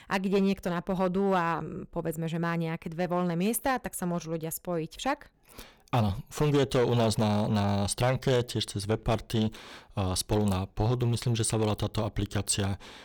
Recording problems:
distortion; slight; 5% of the sound clipped

